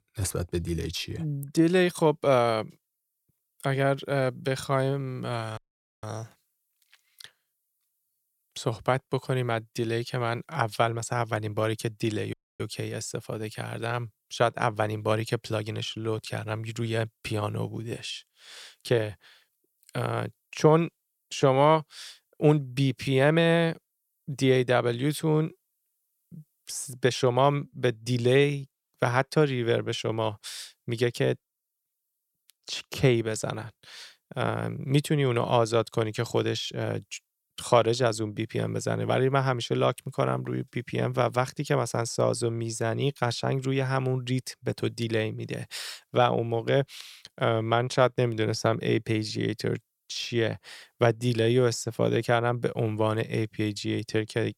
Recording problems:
audio cutting out; at 5.5 s and at 12 s

